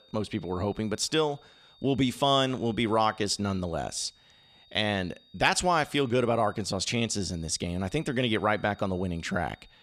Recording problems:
high-pitched whine; faint; throughout; 3.5 kHz, 30 dB below the speech

